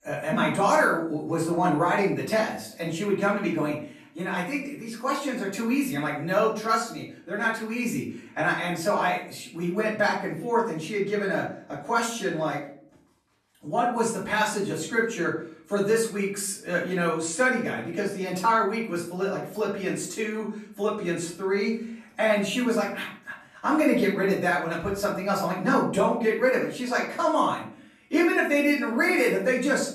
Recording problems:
off-mic speech; far
room echo; noticeable; dies away in 0.5 s

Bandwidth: 13.5 kHz